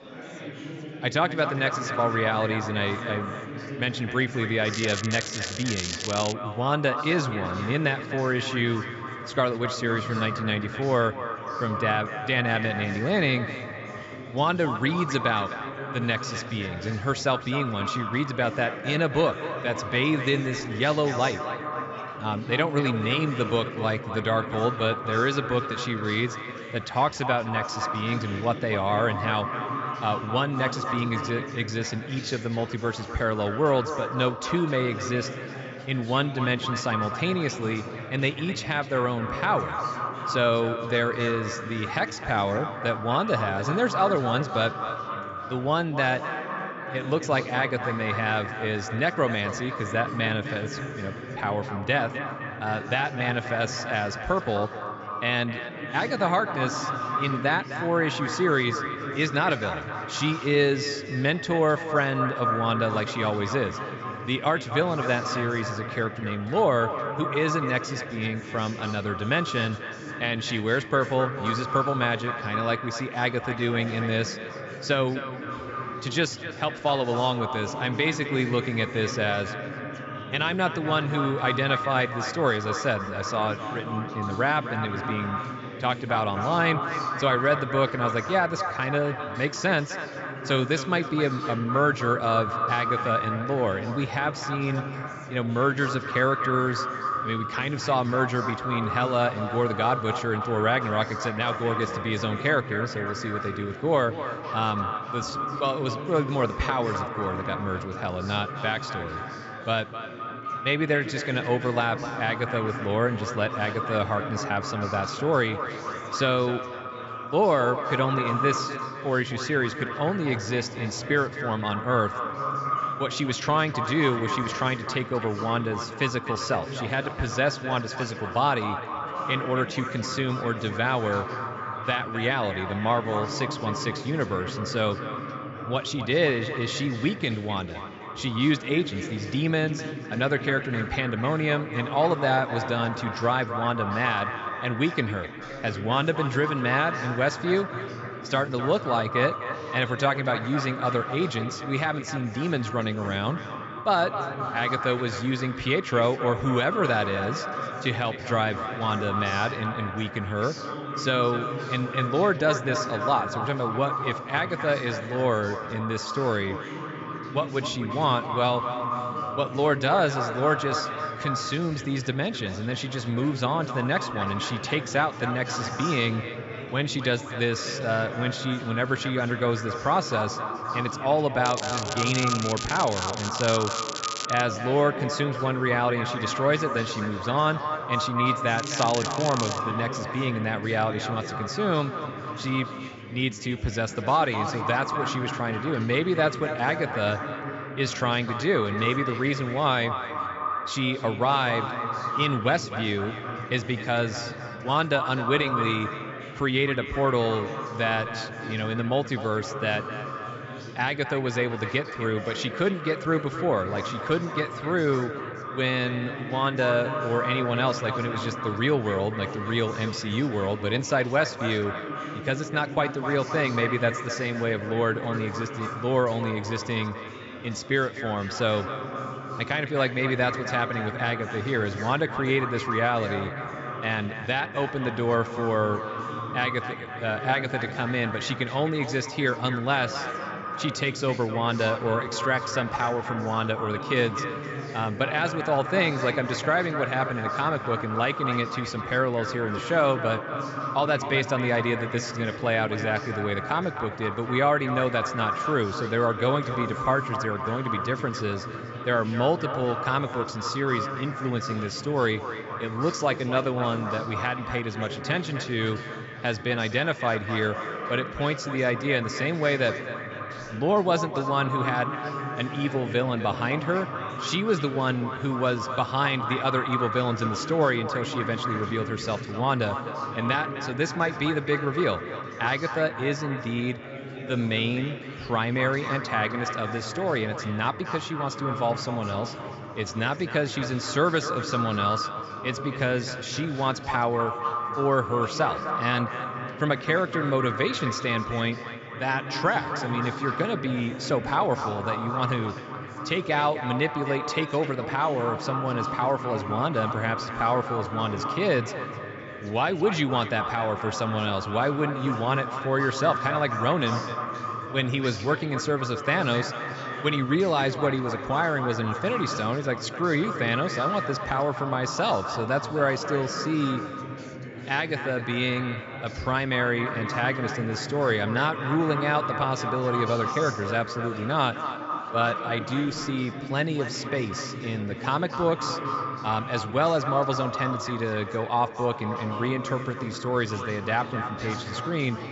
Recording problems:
echo of what is said; strong; throughout; 260 ms later, 7 dB below the speech
high frequencies cut off; noticeable; nothing above 8 kHz
crackling; loud; from 4.5 to 6.5 s, from 3:01 to 3:04 and from 3:09 to 3:10; 6 dB below the speech
chatter from many people; noticeable; throughout; 10 dB below the speech

